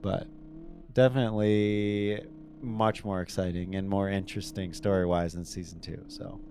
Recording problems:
low rumble; faint; throughout; 25 dB below the speech

